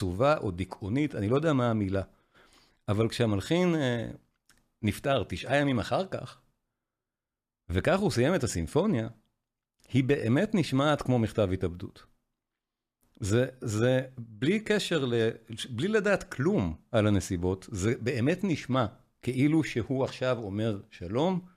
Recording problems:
abrupt cut into speech; at the start

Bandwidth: 14.5 kHz